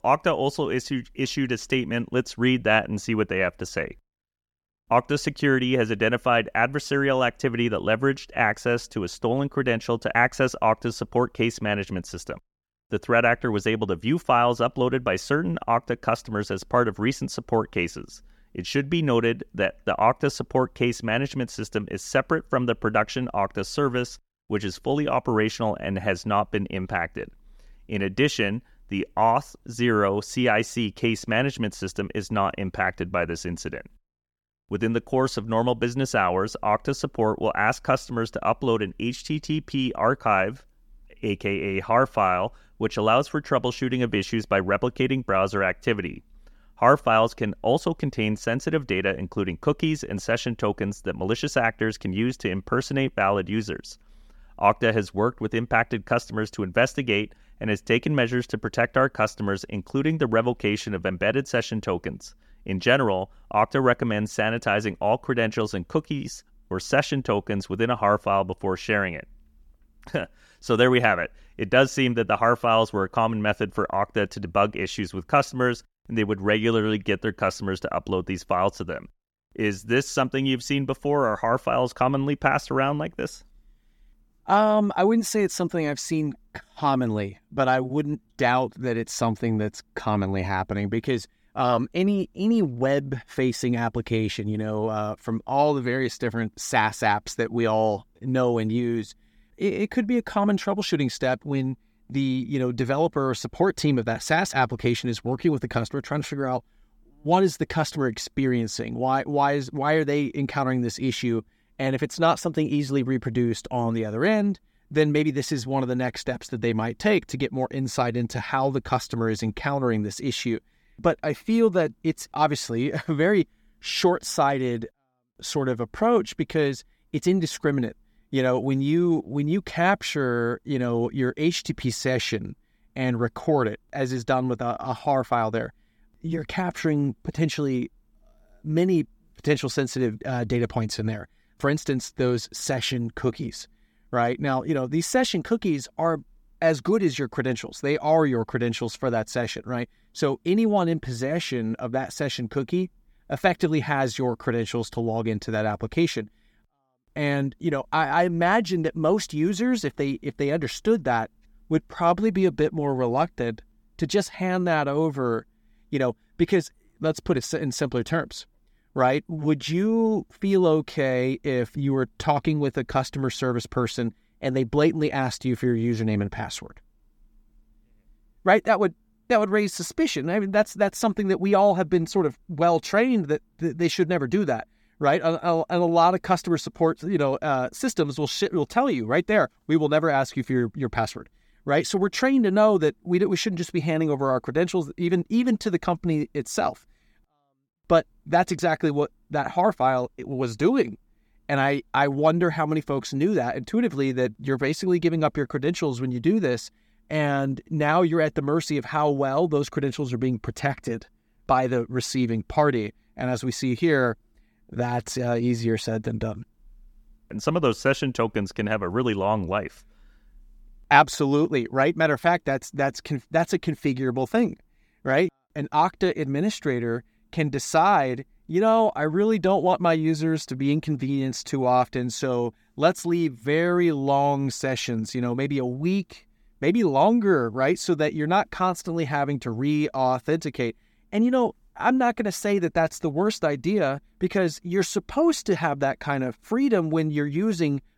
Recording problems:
none

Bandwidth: 17.5 kHz